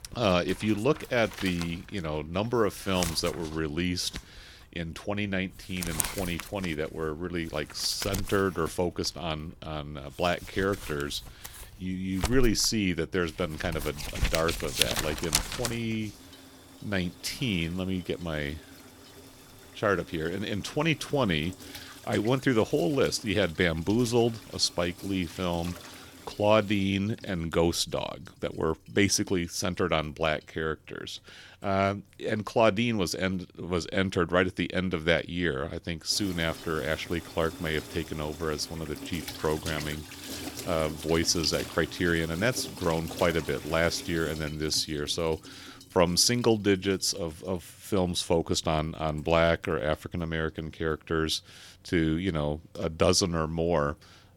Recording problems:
household noises; loud; throughout; 10 dB below the speech

